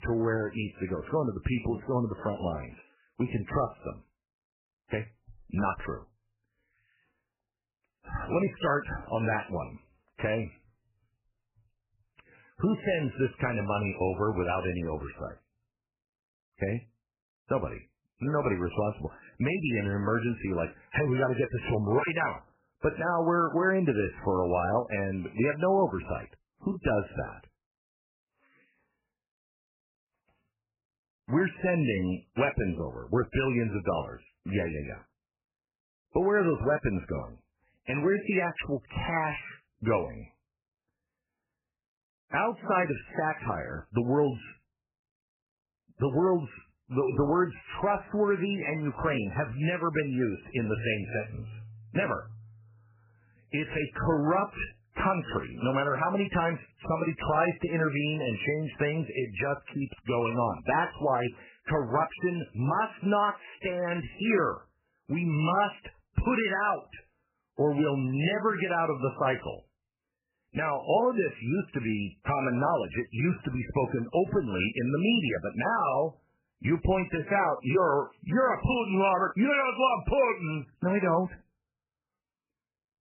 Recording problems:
garbled, watery; badly; nothing above 3 kHz

